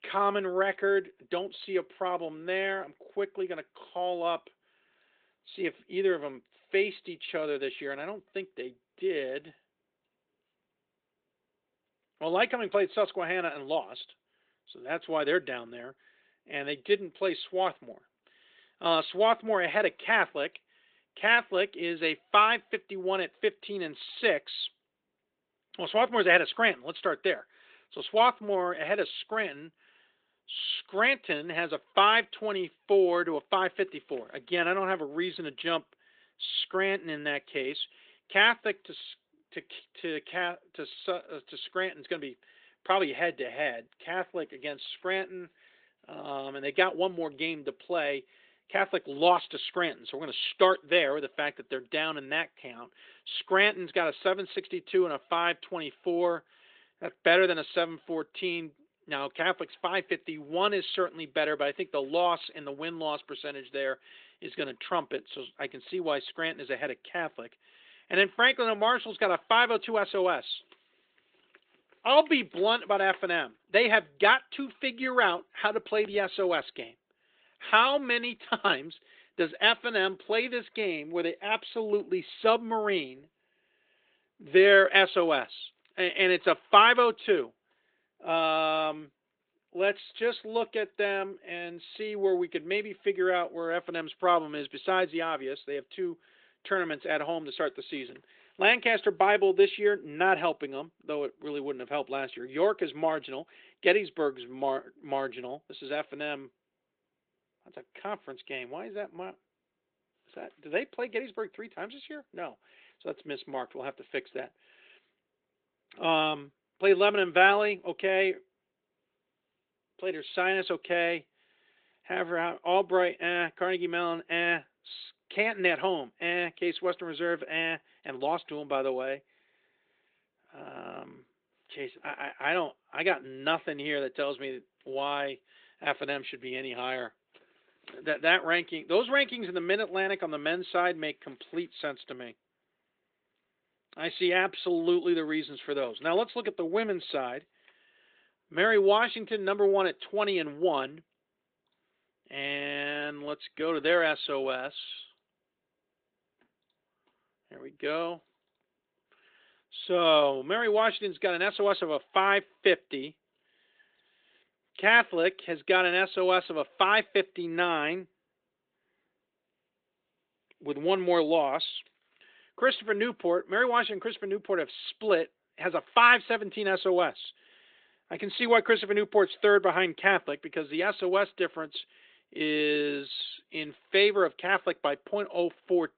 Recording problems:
thin; very; fading below 350 Hz
high frequencies cut off; severe; nothing above 4 kHz
garbled, watery; slightly

